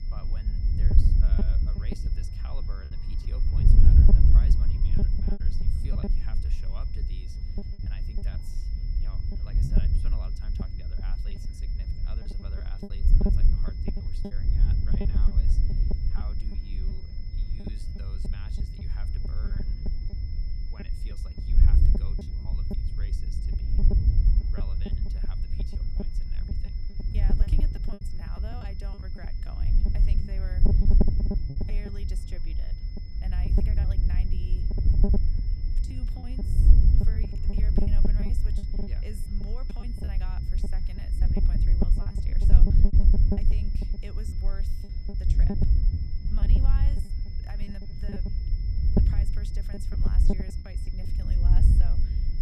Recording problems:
wind noise on the microphone; heavy; 7 dB above the speech
high-pitched whine; loud; throughout; 5 kHz, 6 dB below the speech
murmuring crowd; noticeable; throughout; 20 dB below the speech
electrical hum; faint; throughout; 50 Hz, 25 dB below the speech
choppy; very; 9% of the speech affected

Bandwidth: 14.5 kHz